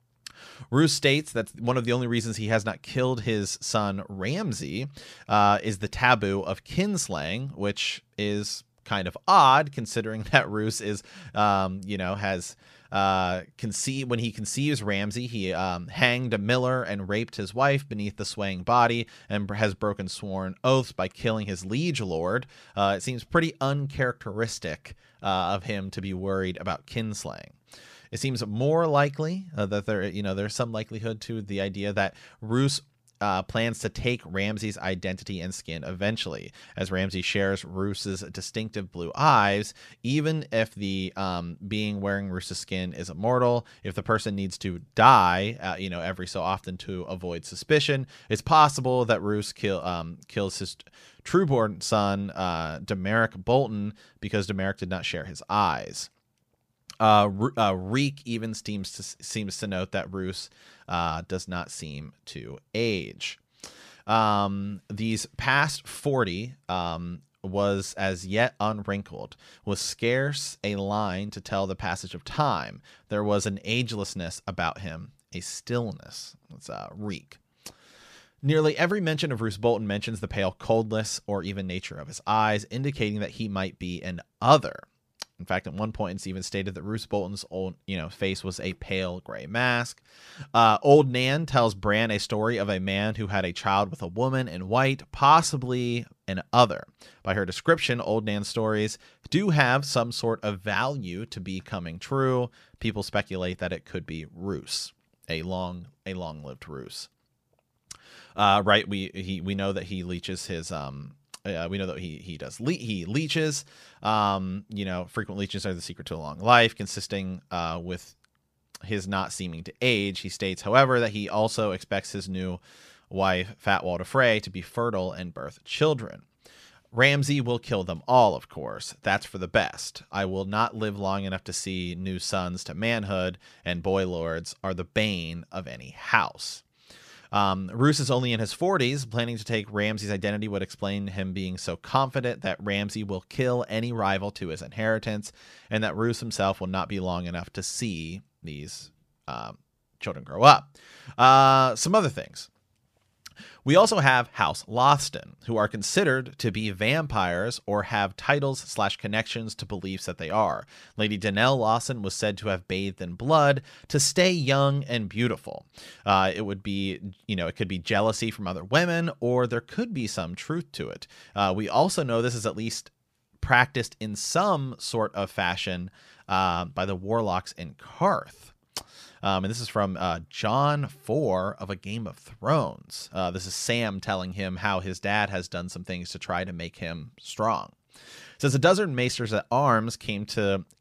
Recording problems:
none

